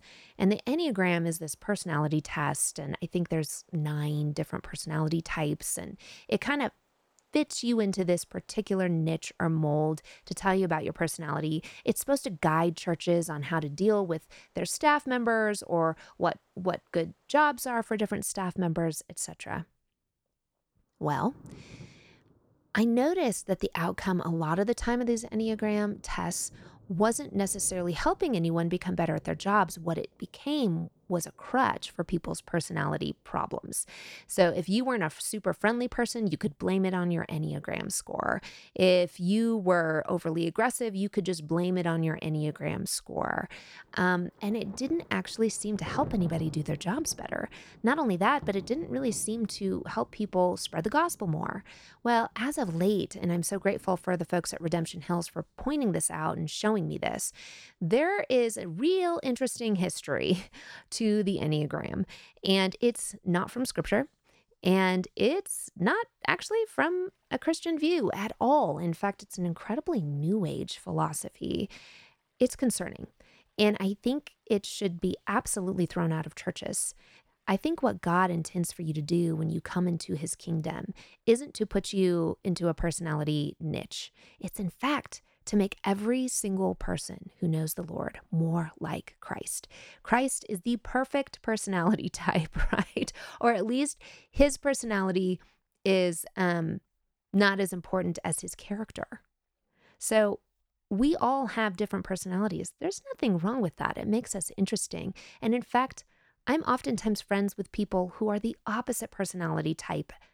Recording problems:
rain or running water; faint; throughout; 20 dB below the speech

